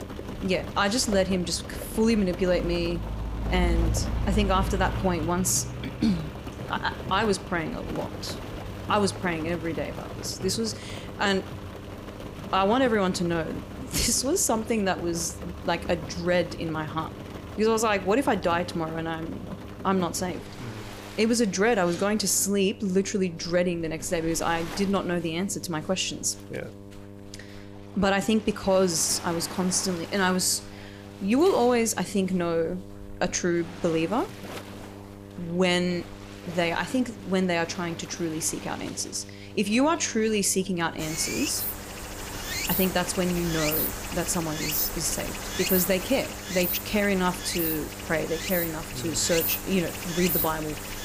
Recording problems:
rain or running water; loud; throughout; 7 dB below the speech
electrical hum; faint; throughout; 50 Hz, 20 dB below the speech

